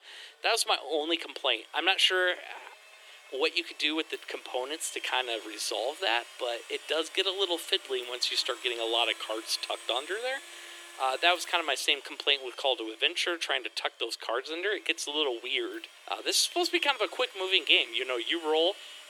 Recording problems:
thin; very; fading below 350 Hz
household noises; noticeable; throughout; 20 dB below the speech

